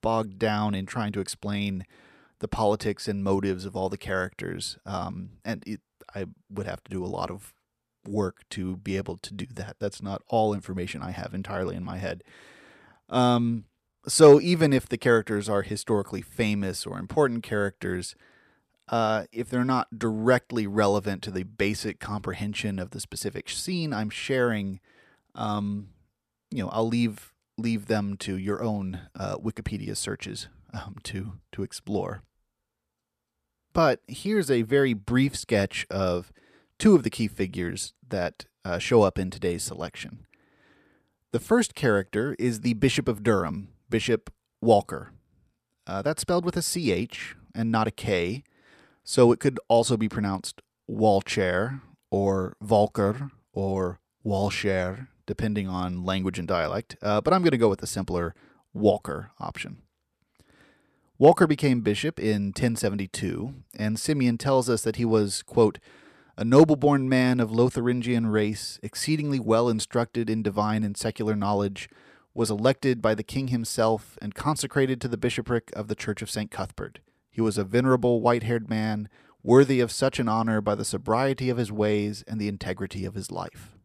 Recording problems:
none

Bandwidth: 14.5 kHz